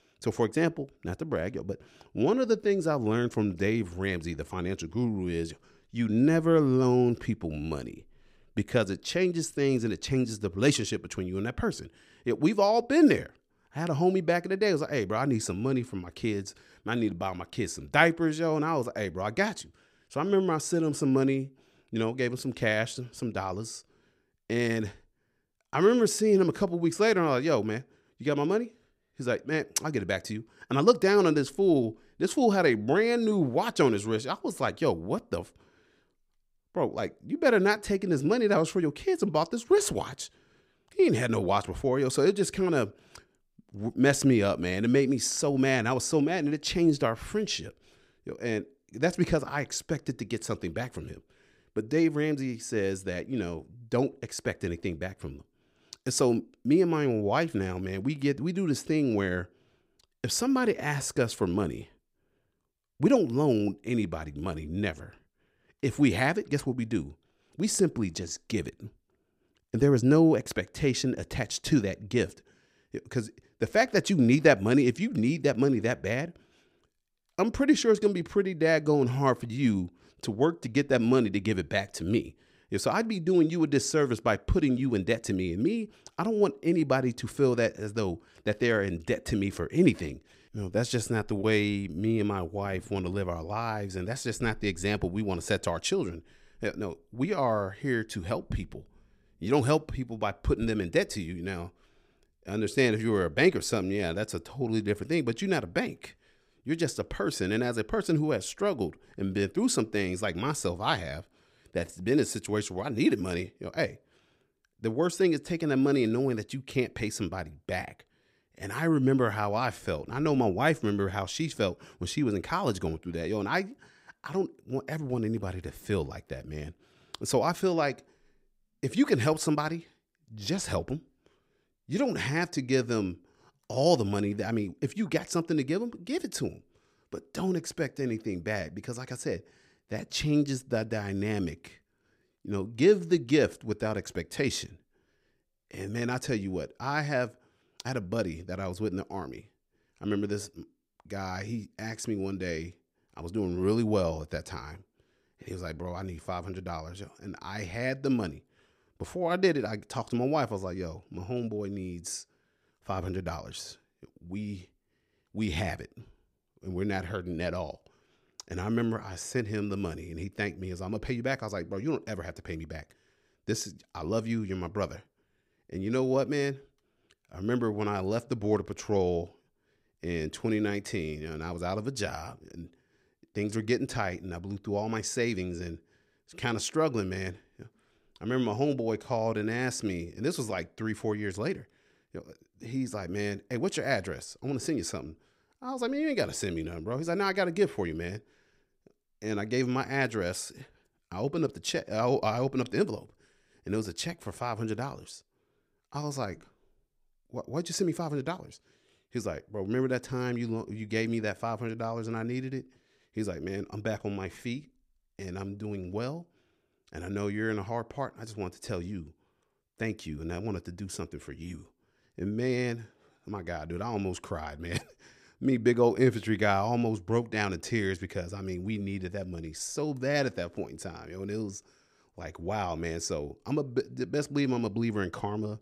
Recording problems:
none

